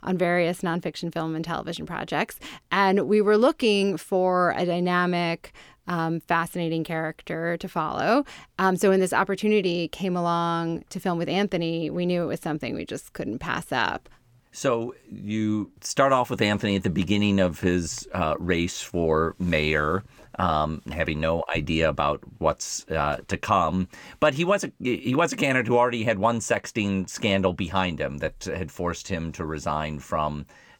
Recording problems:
none

